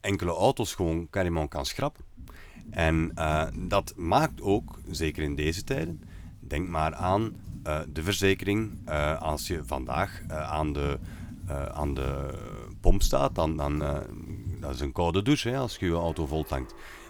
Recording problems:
household noises; noticeable; throughout; 15 dB below the speech

